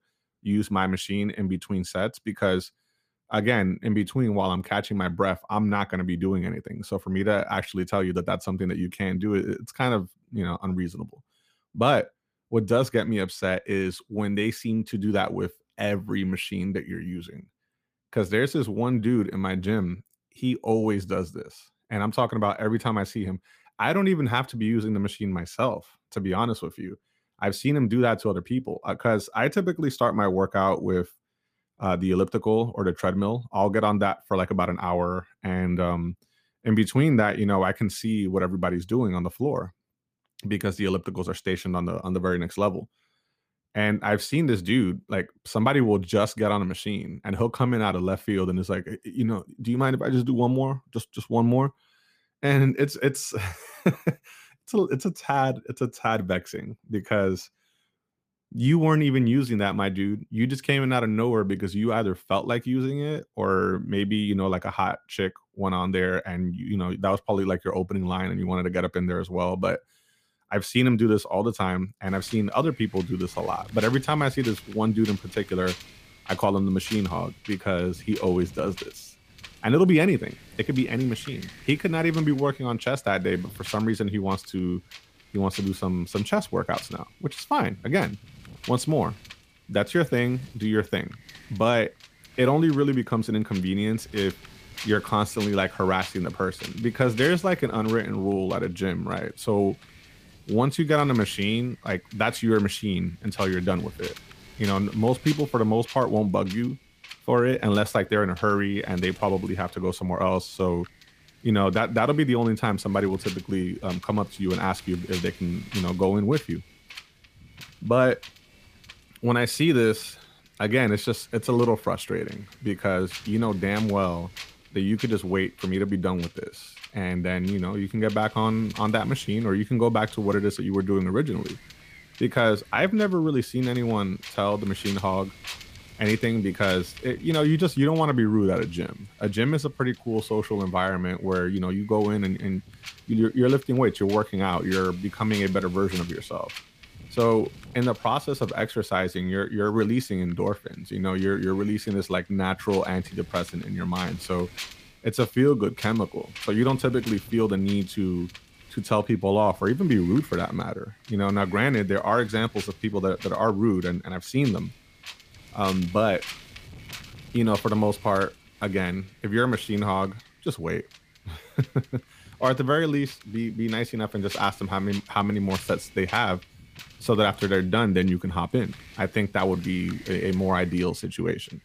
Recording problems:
wind noise on the microphone; occasional gusts; from 1:12 on; 15 dB below the speech

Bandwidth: 15 kHz